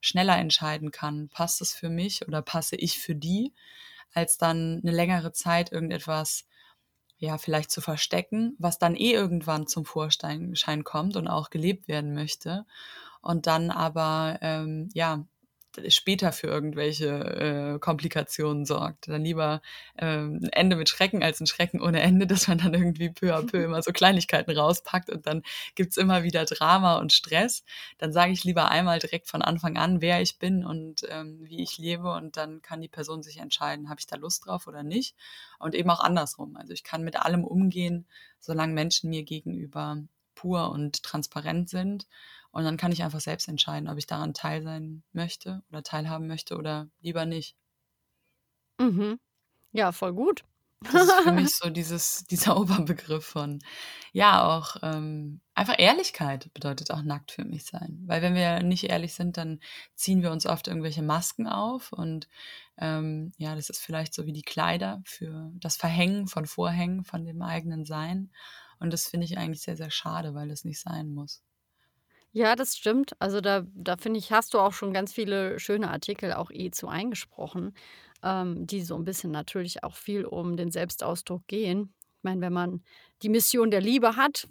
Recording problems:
none

